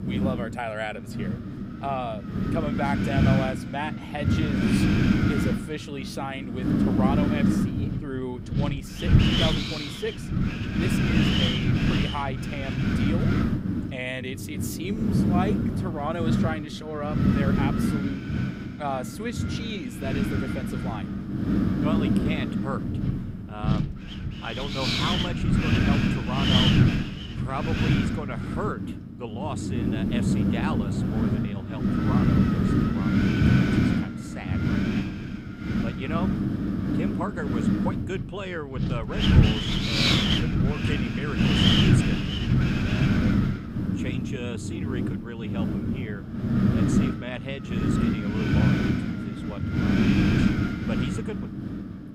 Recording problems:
wind noise on the microphone; heavy; 5 dB above the speech

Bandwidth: 15.5 kHz